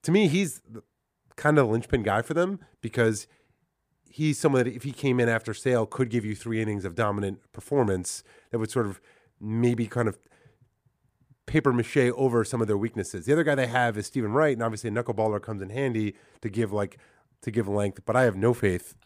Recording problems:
none

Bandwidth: 15 kHz